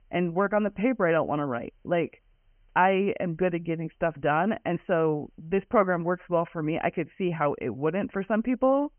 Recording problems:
high frequencies cut off; severe; nothing above 3 kHz
hiss; very faint; throughout; 50 dB below the speech

